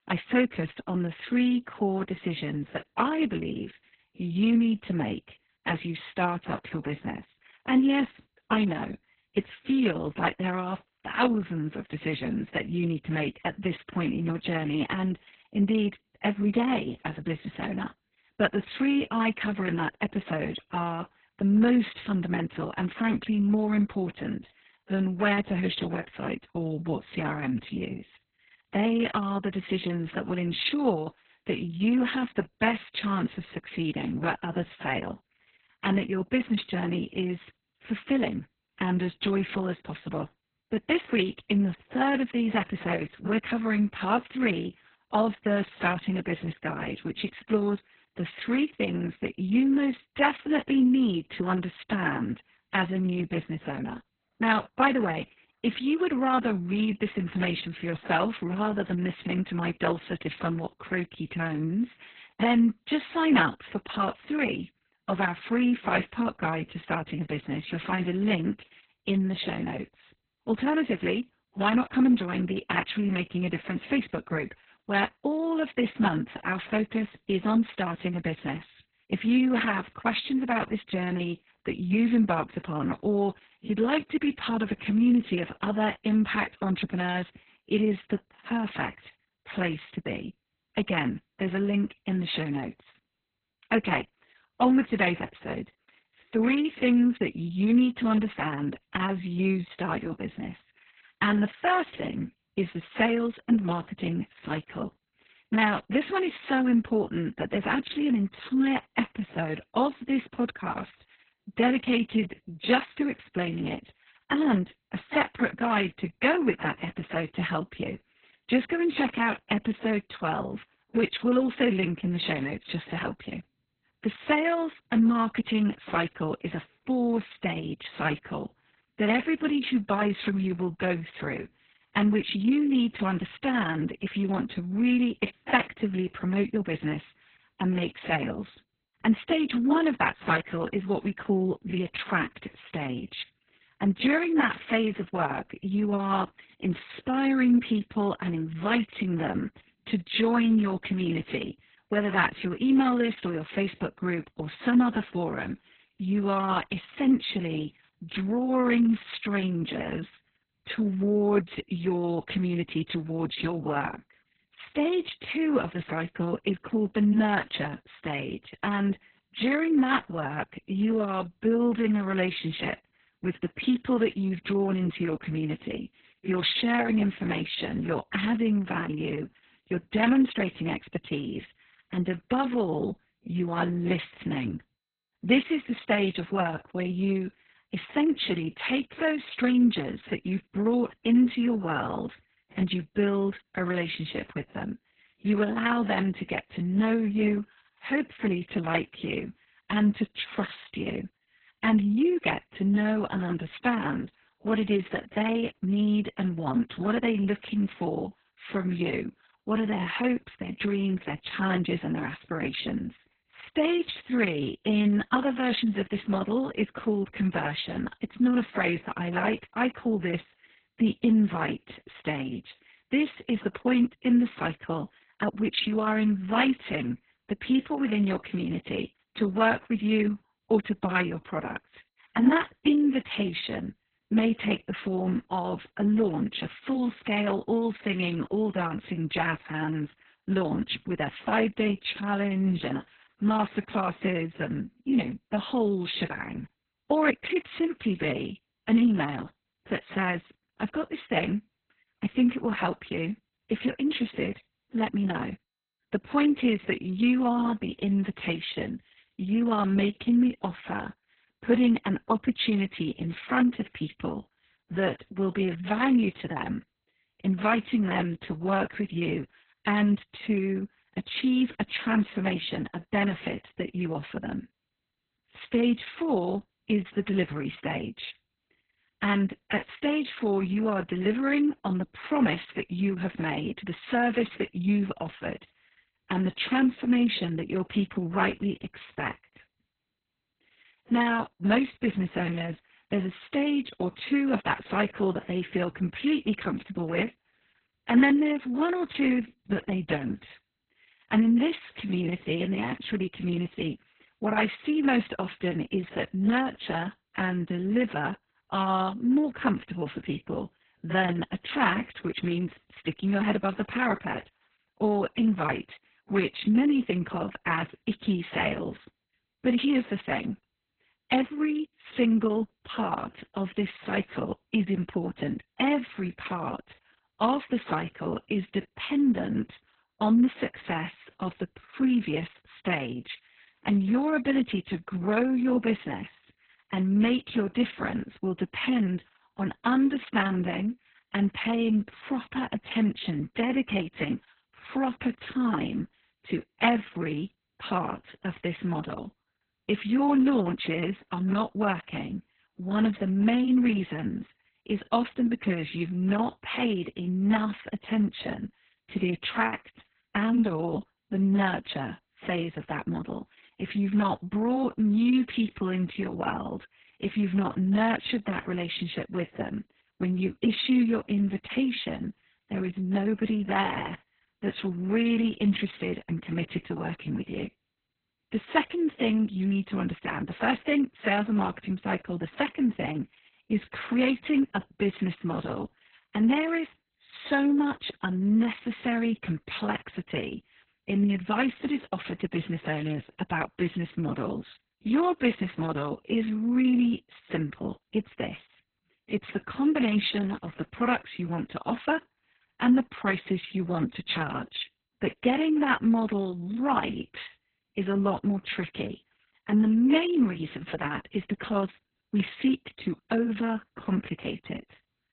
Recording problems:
garbled, watery; badly; nothing above 4 kHz

